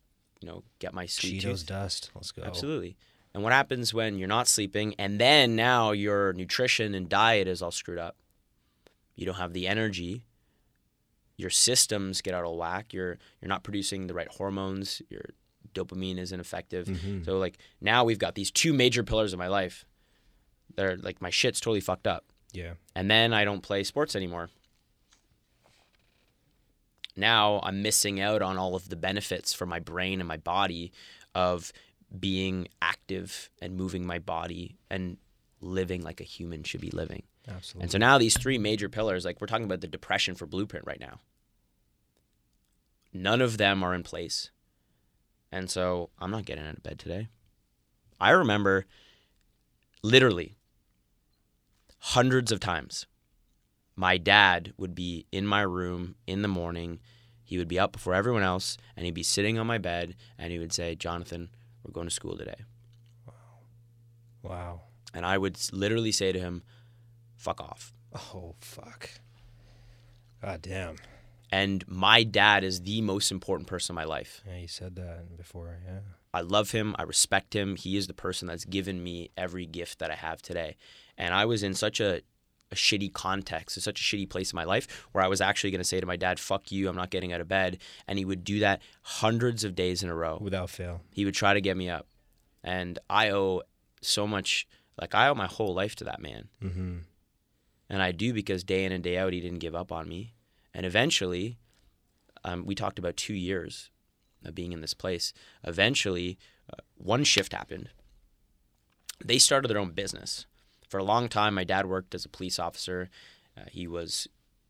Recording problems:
none

